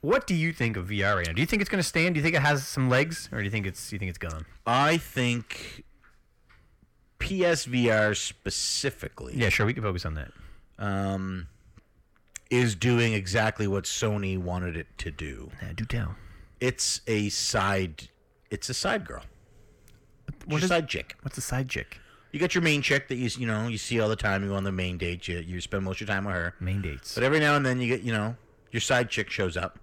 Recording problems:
distortion; slight; 10 dB below the speech

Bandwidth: 17 kHz